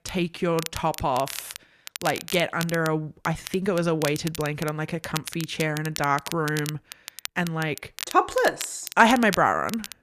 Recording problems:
crackle, like an old record; noticeable; 10 dB below the speech

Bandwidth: 14.5 kHz